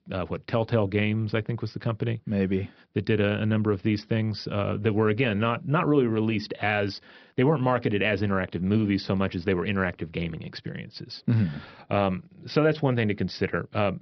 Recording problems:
high frequencies cut off; noticeable; nothing above 5.5 kHz

